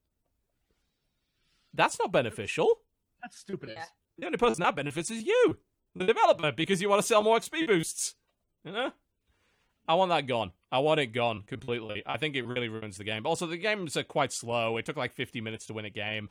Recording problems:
choppy; very; from 3.5 to 8 s and from 11 to 13 s; 13% of the speech affected

